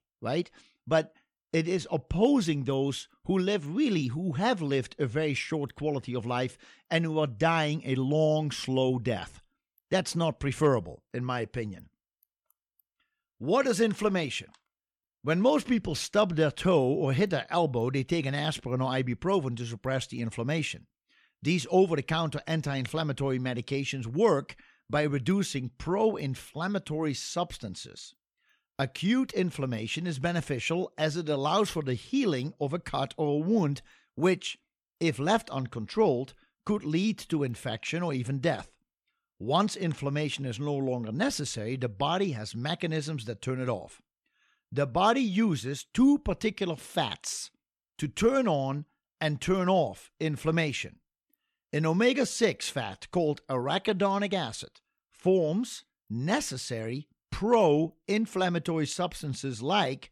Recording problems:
none

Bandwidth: 17 kHz